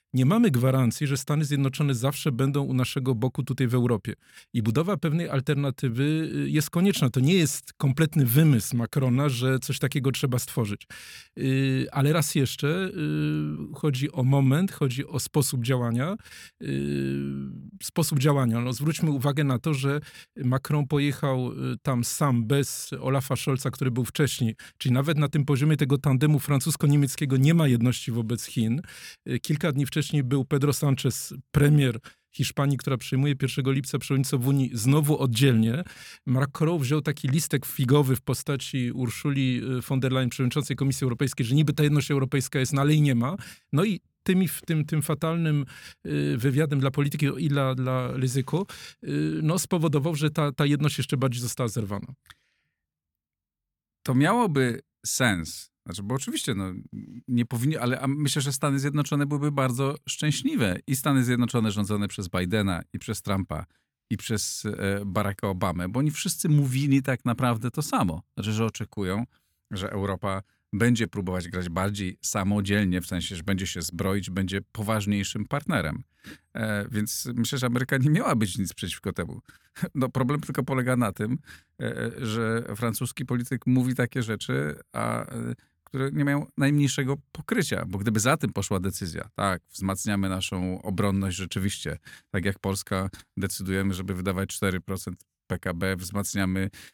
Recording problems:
none

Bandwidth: 17.5 kHz